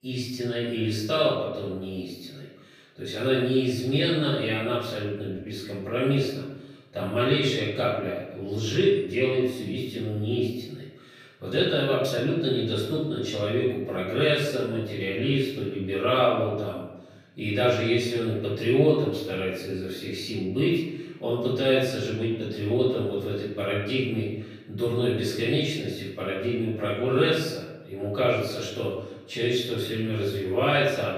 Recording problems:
off-mic speech; far
room echo; noticeable; dies away in 0.9 s

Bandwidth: 15 kHz